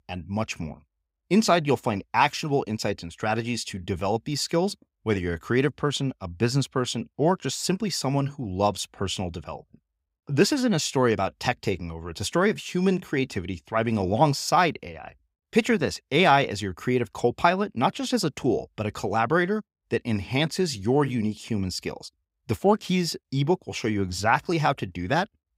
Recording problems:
none

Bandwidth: 15.5 kHz